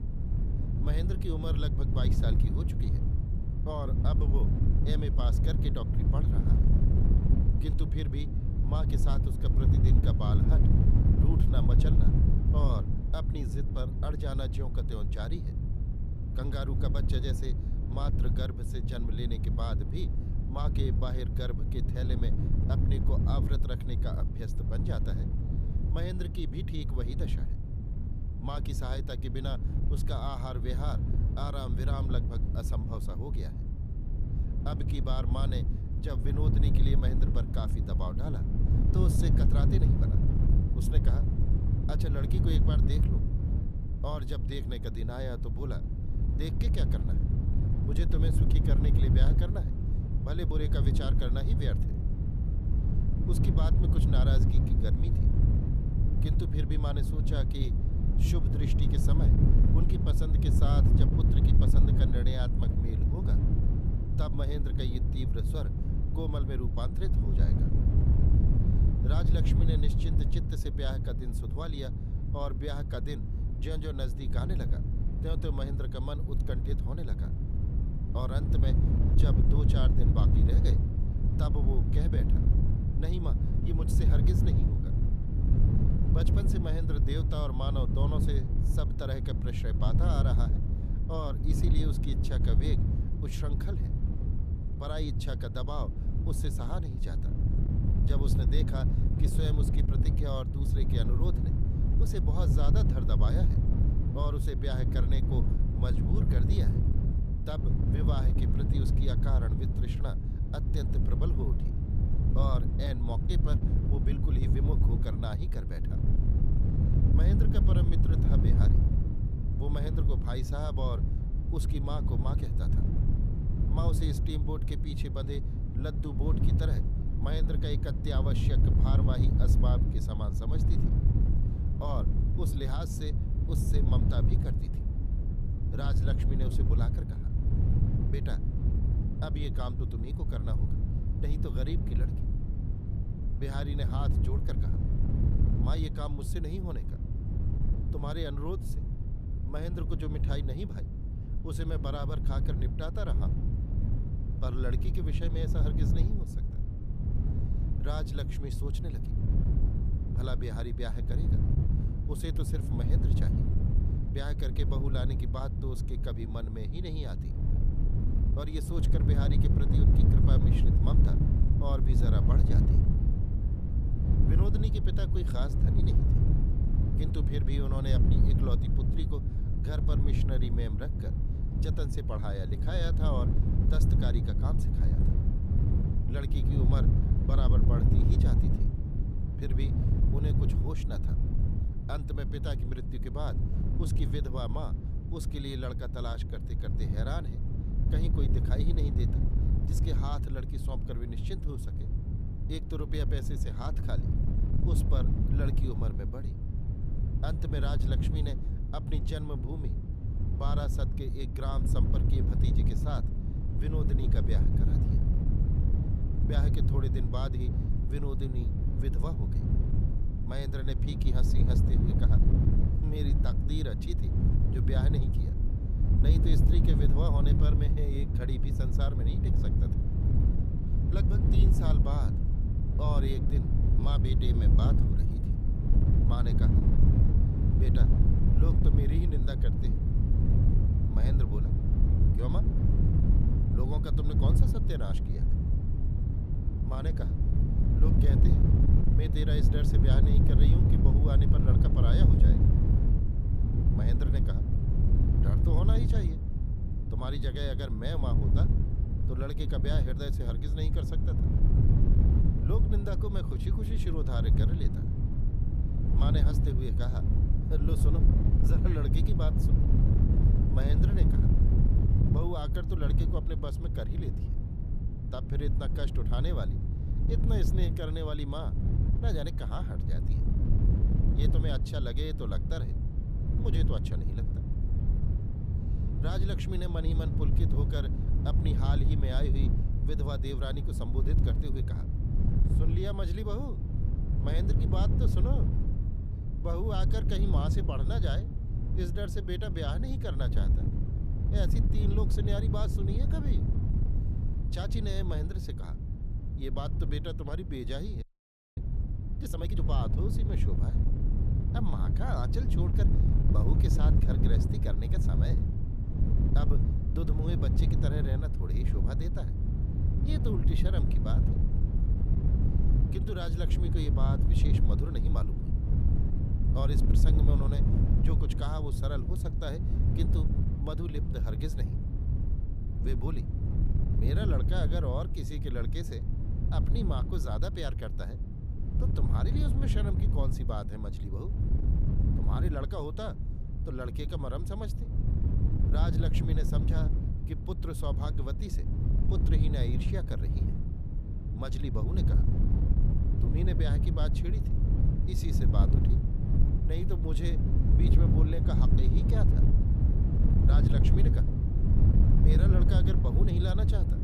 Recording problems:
wind noise on the microphone; heavy; 1 dB below the speech
audio freezing; at 5:08 for 0.5 s

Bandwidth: 14.5 kHz